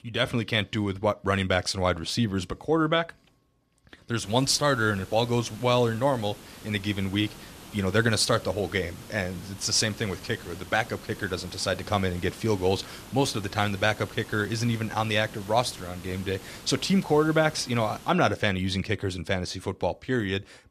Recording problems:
hiss; noticeable; from 4 to 18 s; 20 dB below the speech

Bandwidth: 14 kHz